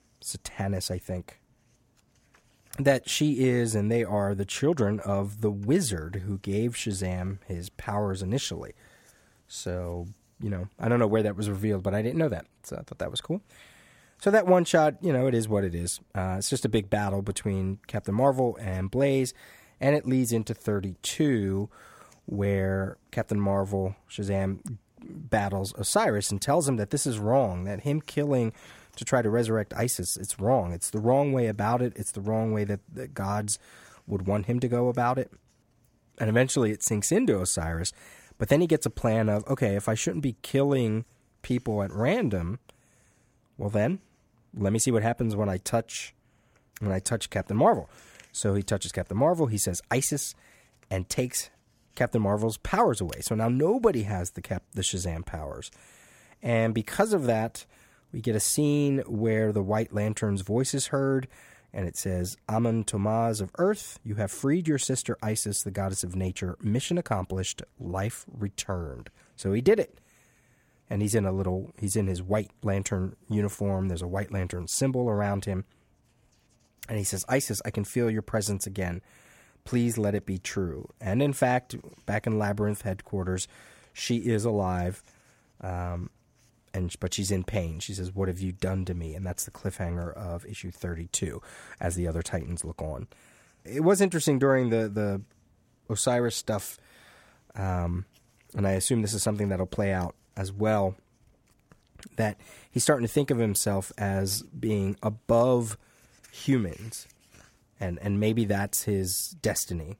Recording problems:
none

